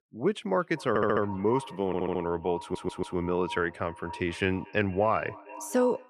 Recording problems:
echo of what is said; noticeable; throughout; 230 ms later, 15 dB below the speech
audio stuttering; at 1 s, at 2 s and at 2.5 s

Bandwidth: 14 kHz